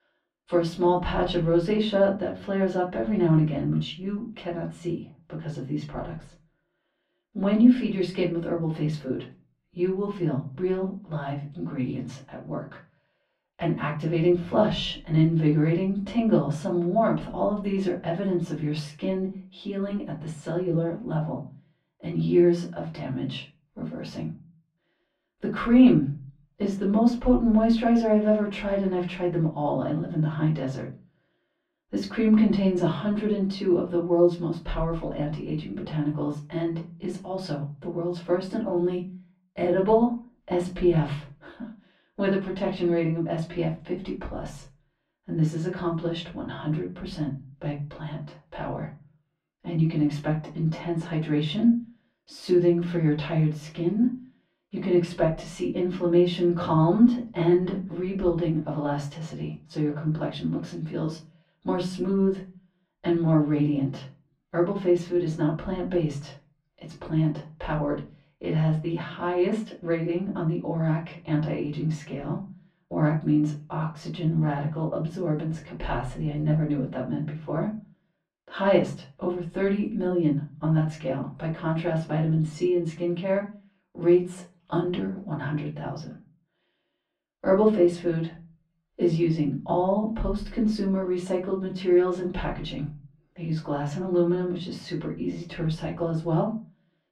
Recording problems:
off-mic speech; far
muffled; very; fading above 2.5 kHz
room echo; slight; dies away in 0.3 s

